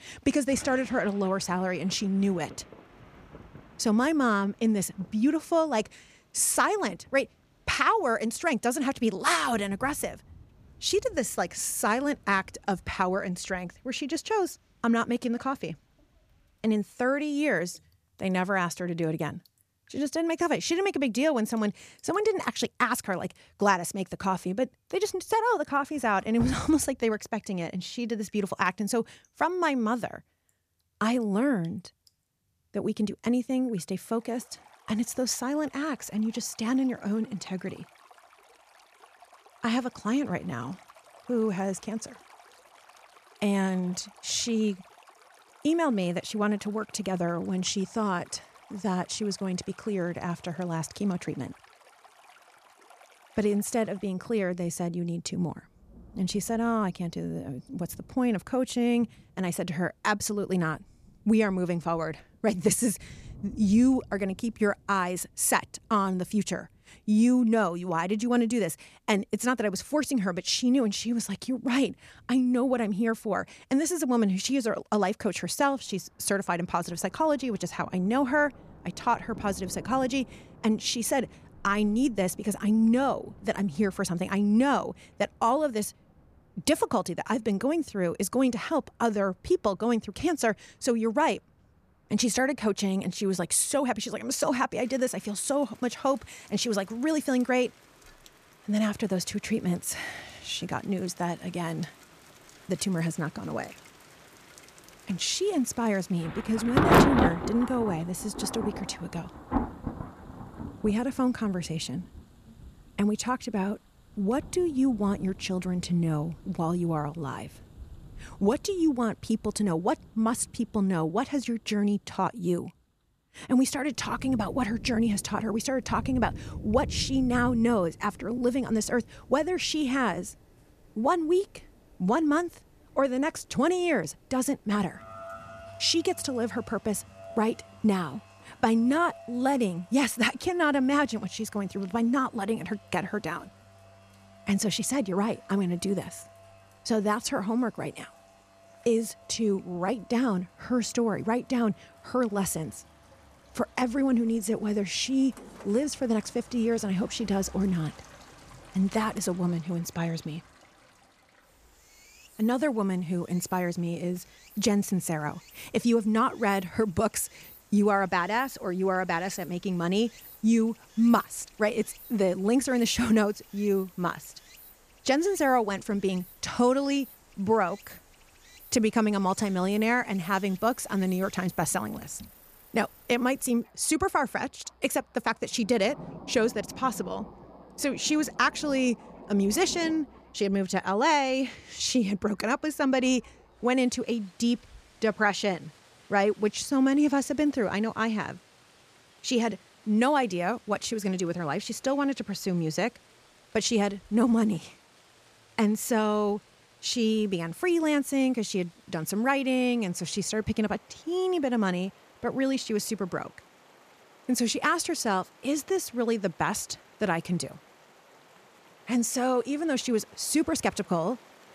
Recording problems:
rain or running water; noticeable; throughout; 10 dB below the speech

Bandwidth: 14.5 kHz